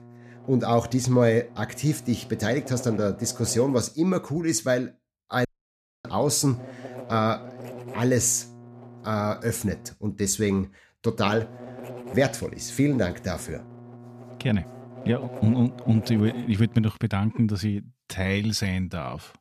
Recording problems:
electrical hum; noticeable; until 3.5 s, from 6.5 to 10 s and from 11 to 17 s; 60 Hz, 15 dB below the speech
audio cutting out; at 5.5 s for 0.5 s

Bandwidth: 14.5 kHz